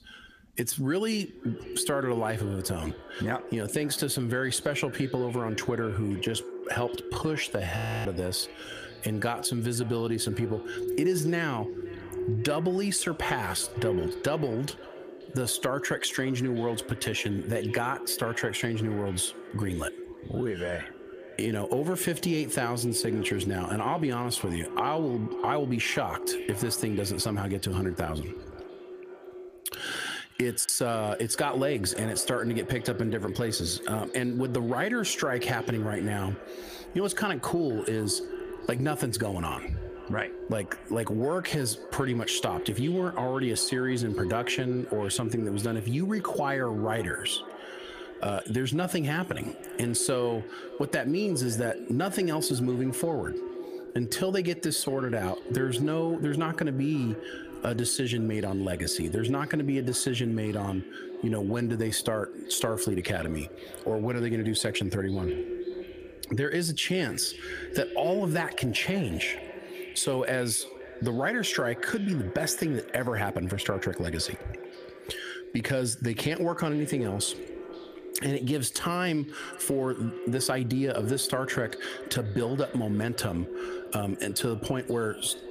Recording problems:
echo of what is said; strong; throughout; 530 ms later, 10 dB below the speech
squashed, flat; heavily
audio freezing; at 8 s

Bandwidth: 15 kHz